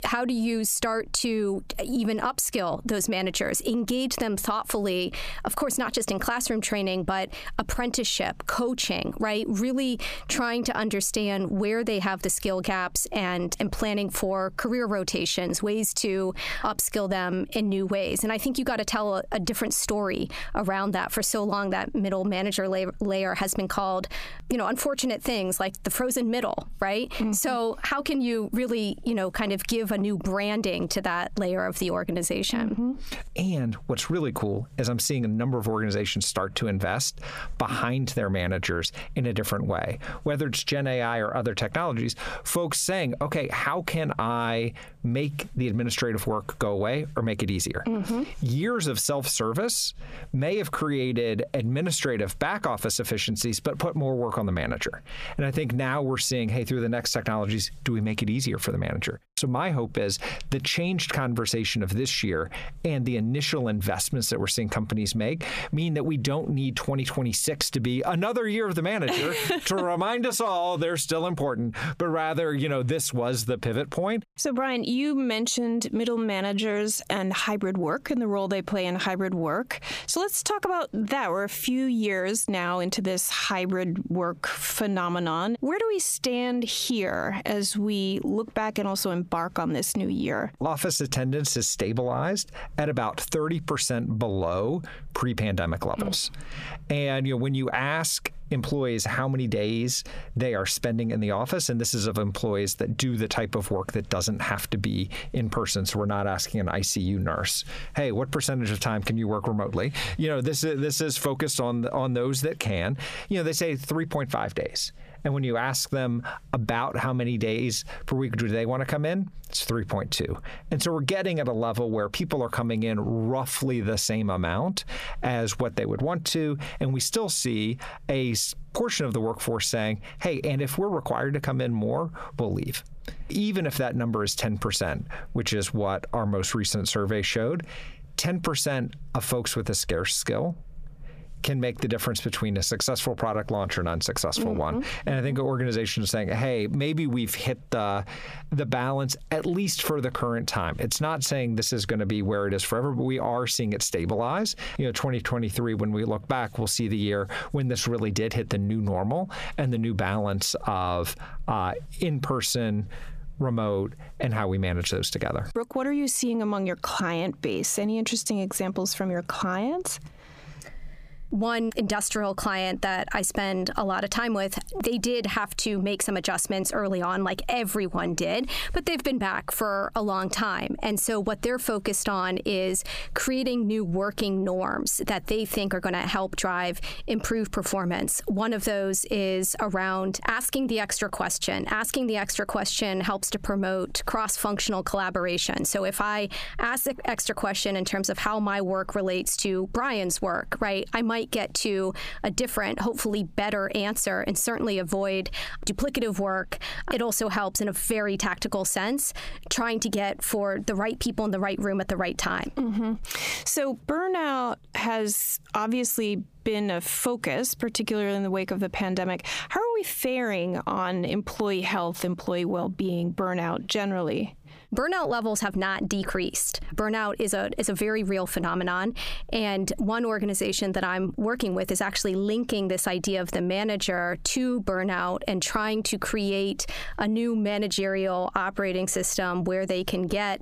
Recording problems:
squashed, flat; heavily

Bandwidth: 15 kHz